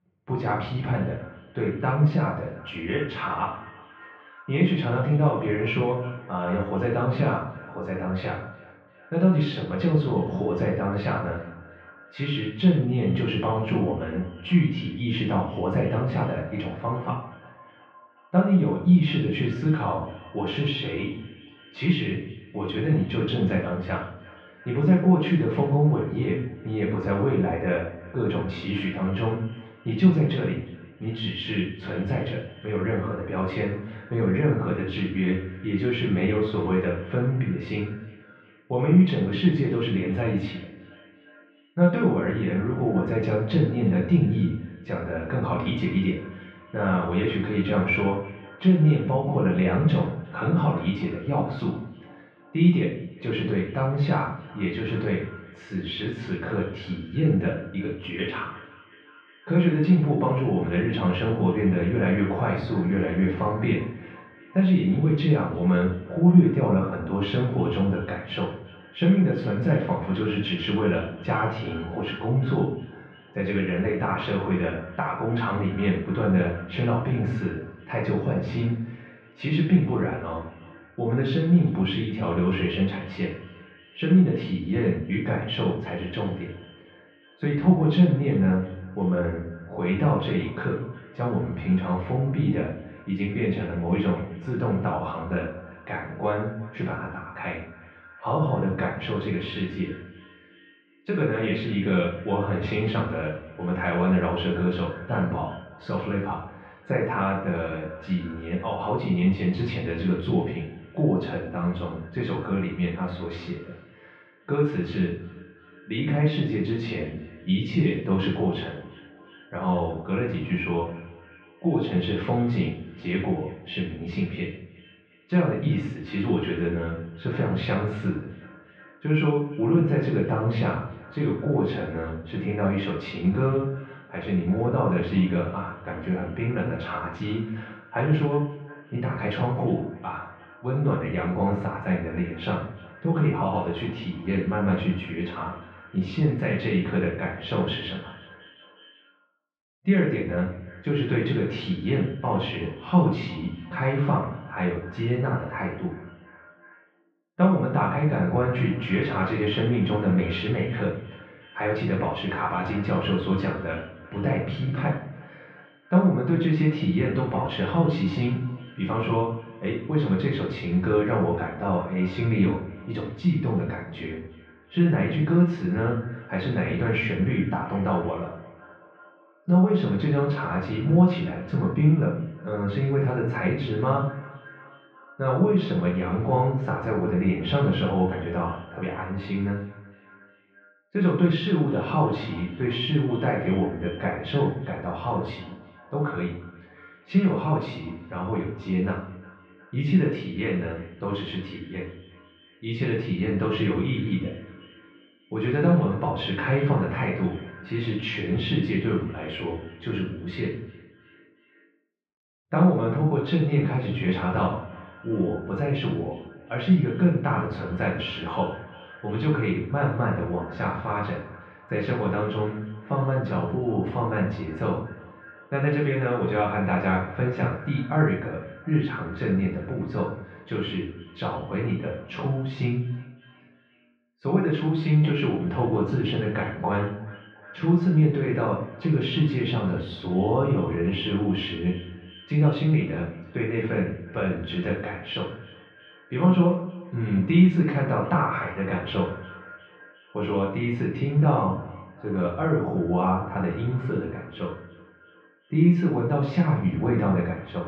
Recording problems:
off-mic speech; far
muffled; very; fading above 3 kHz
echo of what is said; faint; throughout; 360 ms later, 20 dB below the speech
room echo; slight; dies away in 0.5 s

